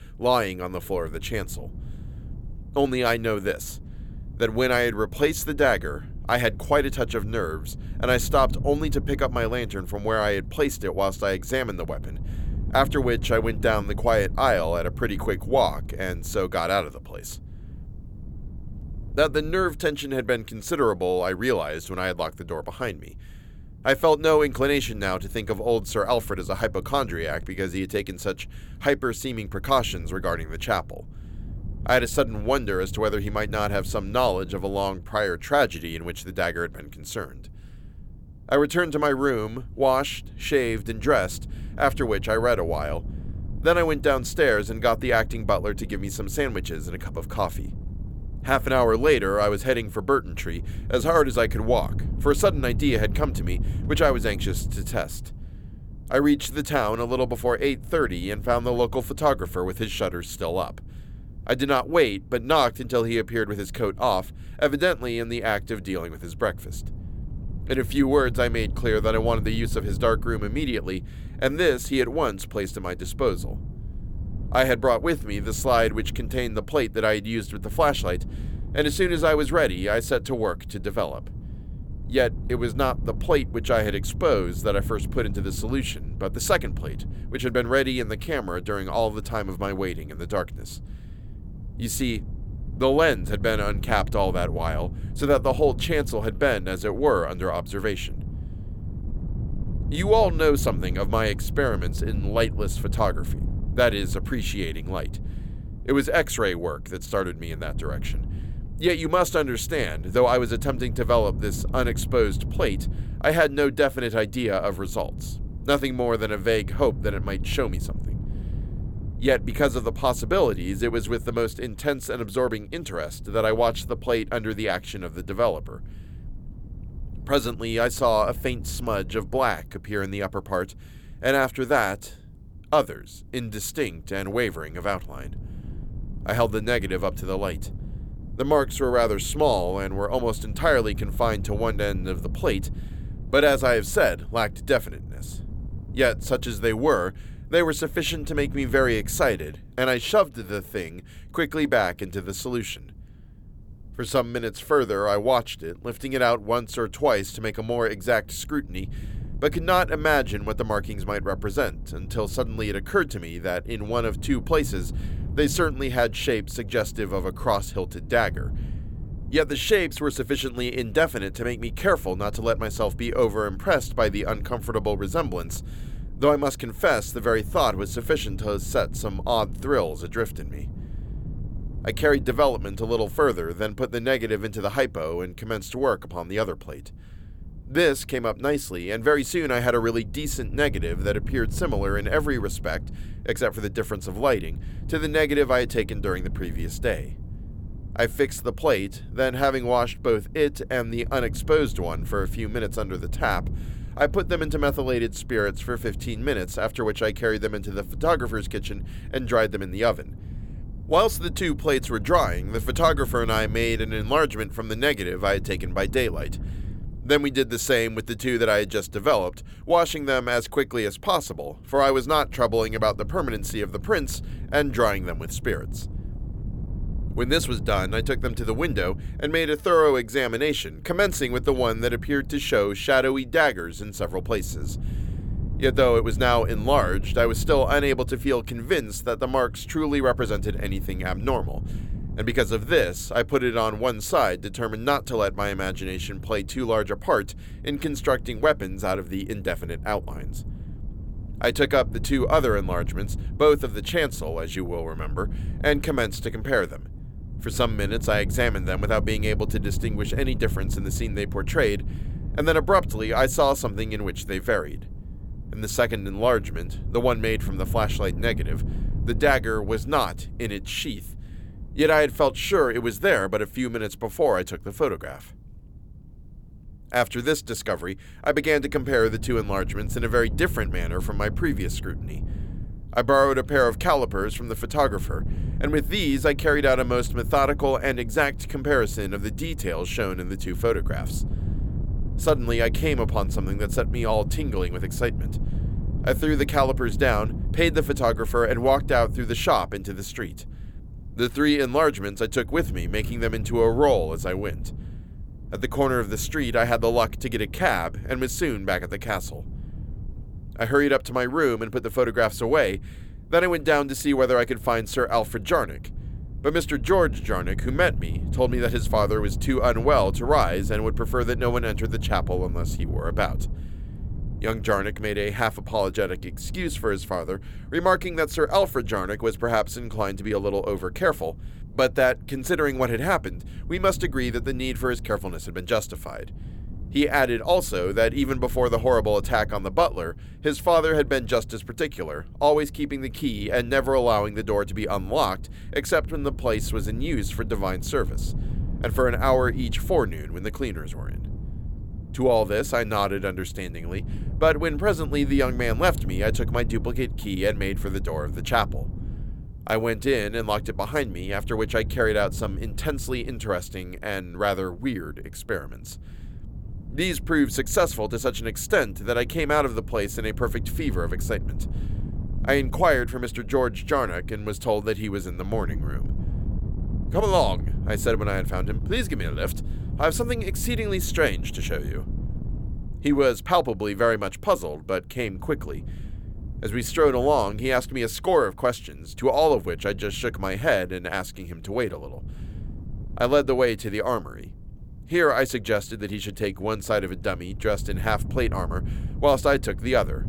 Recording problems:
wind noise on the microphone; occasional gusts; 20 dB below the speech

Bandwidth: 17.5 kHz